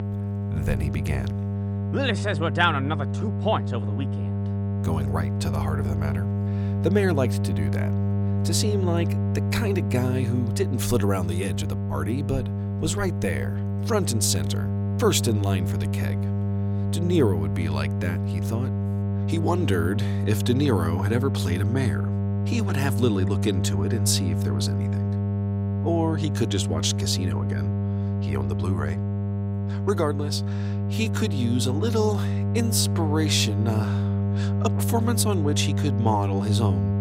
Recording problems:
electrical hum; loud; throughout; 50 Hz, 7 dB below the speech

